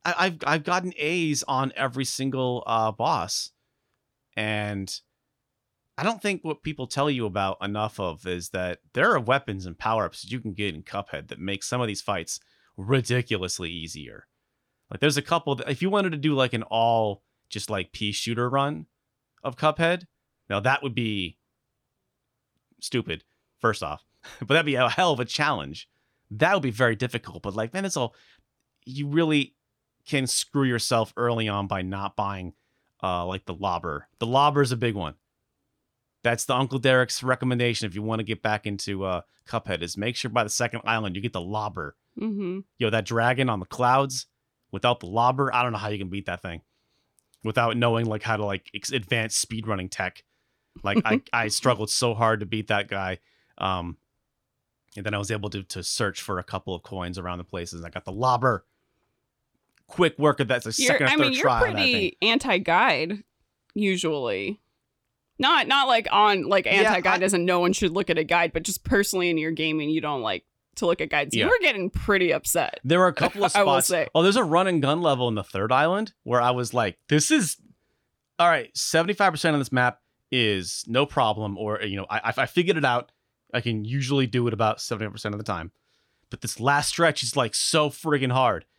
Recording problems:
none

